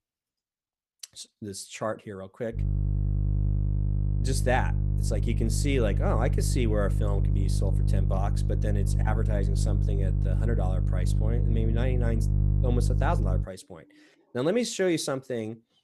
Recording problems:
electrical hum; loud; from 2.5 to 13 s; 50 Hz, 8 dB below the speech

